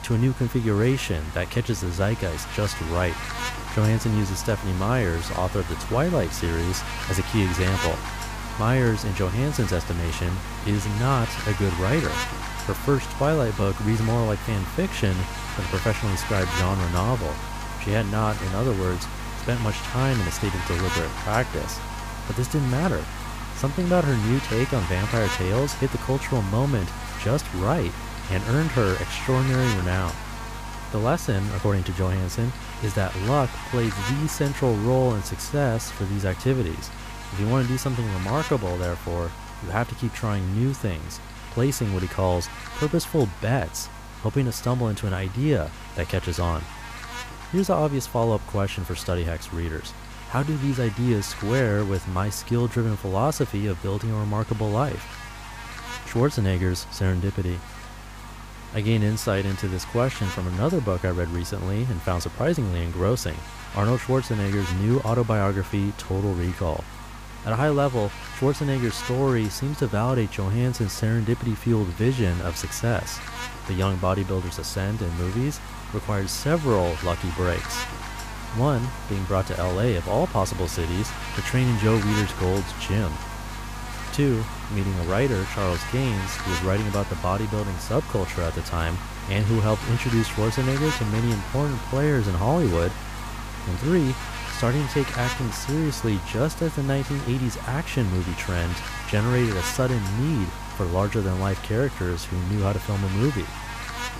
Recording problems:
electrical hum; loud; throughout; 50 Hz, 5 dB below the speech

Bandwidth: 15 kHz